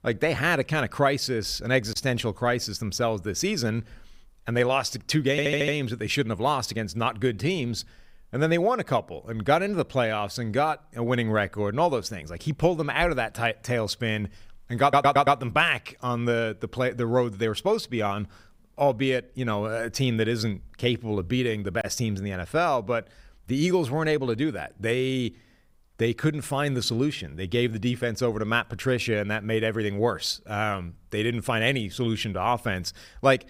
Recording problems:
audio stuttering; at 5.5 s and at 15 s

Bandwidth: 15.5 kHz